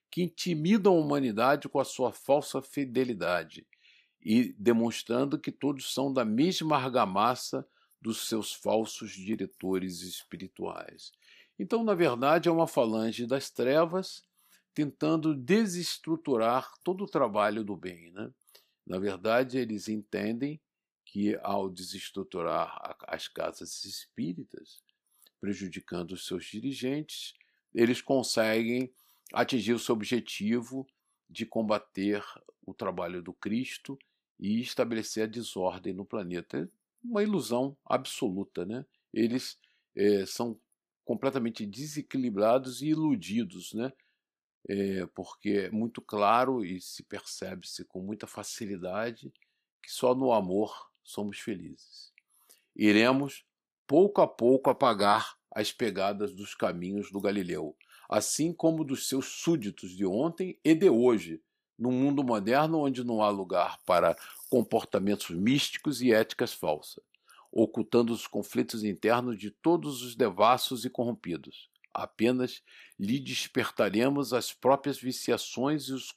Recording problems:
none

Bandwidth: 14.5 kHz